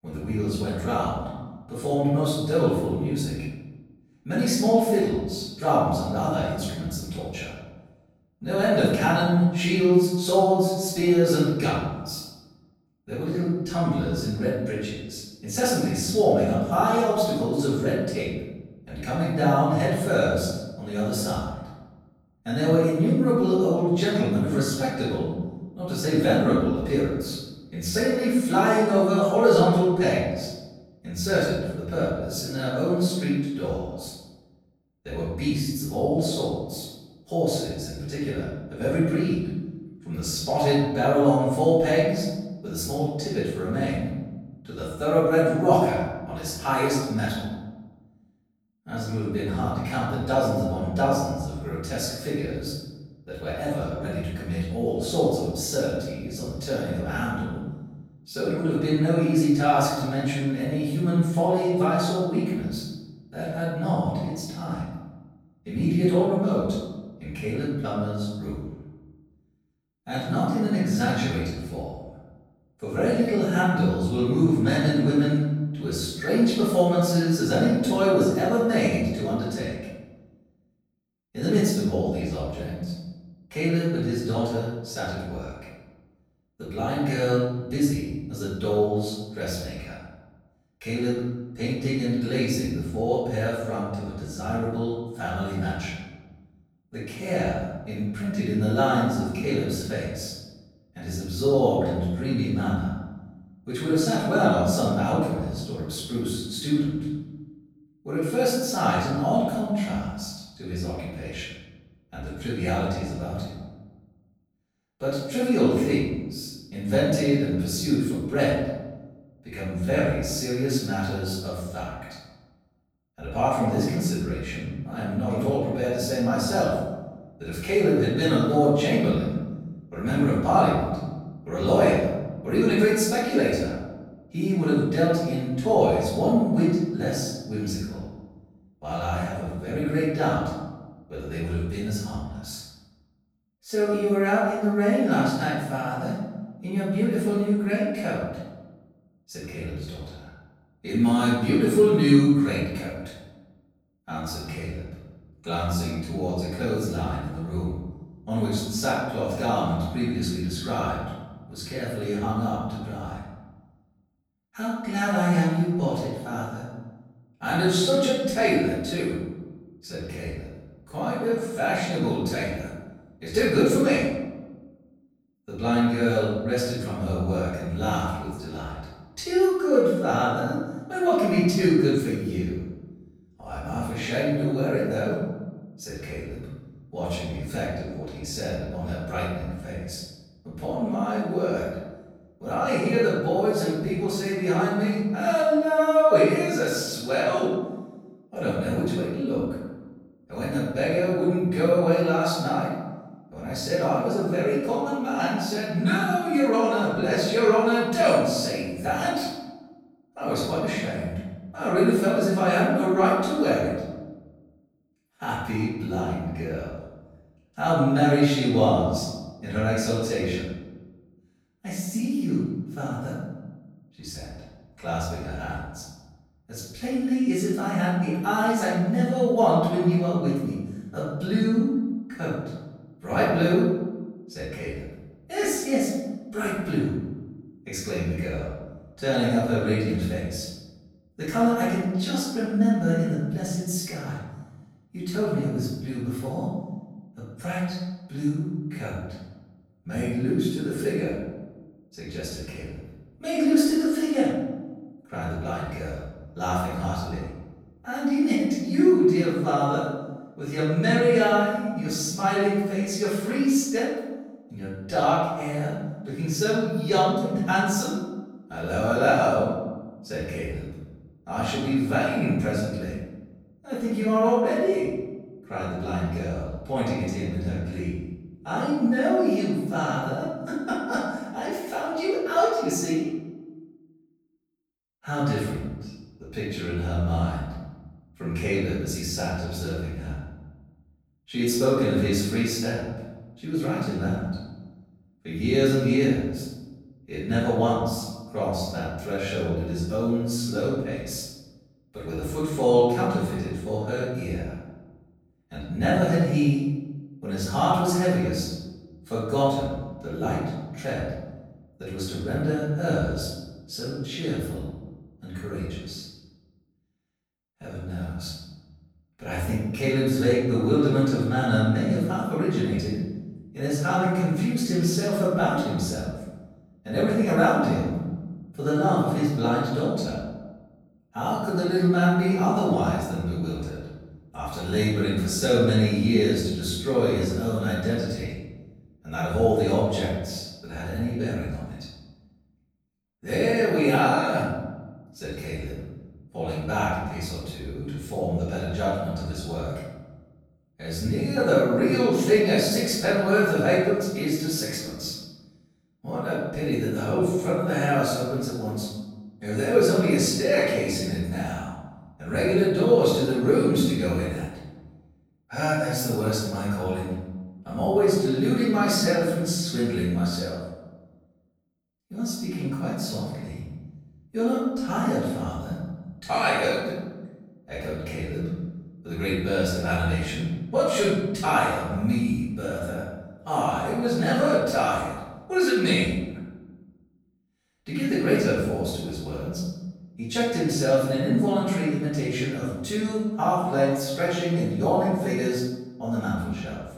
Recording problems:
room echo; strong; dies away in 1.1 s
off-mic speech; far

